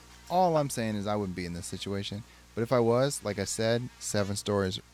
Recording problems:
electrical hum; faint; throughout; 60 Hz, 25 dB below the speech

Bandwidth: 17.5 kHz